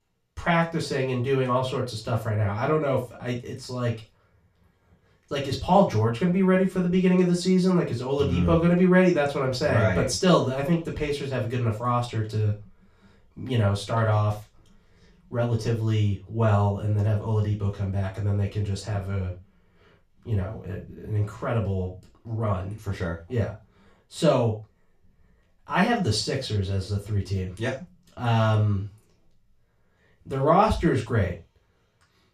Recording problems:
off-mic speech; far
room echo; slight; dies away in 0.3 s

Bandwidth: 14.5 kHz